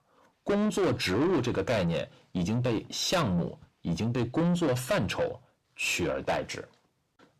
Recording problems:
distortion; heavy; 6 dB below the speech

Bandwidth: 14.5 kHz